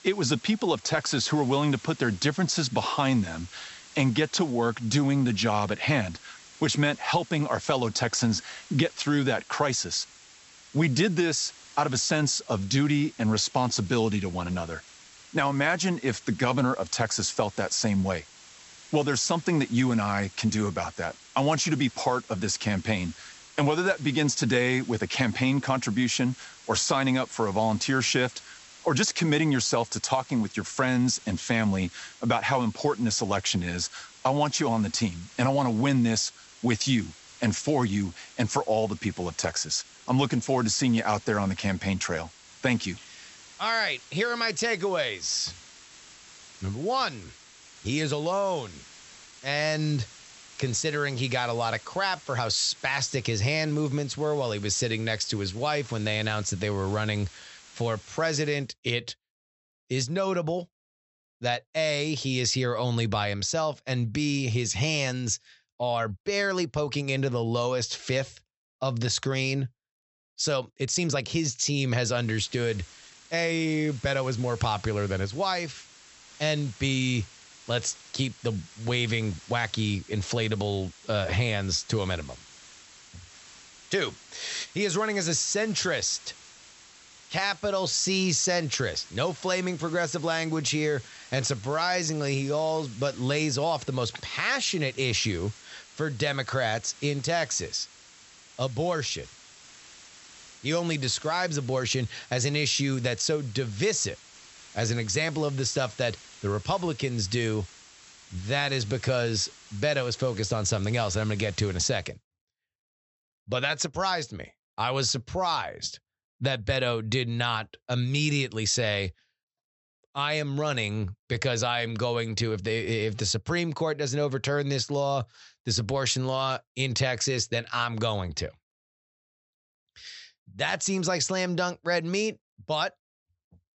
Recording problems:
high frequencies cut off; noticeable; nothing above 8 kHz
hiss; faint; until 59 s and from 1:12 to 1:52; 20 dB below the speech
uneven, jittery; strongly; from 49 s to 1:33

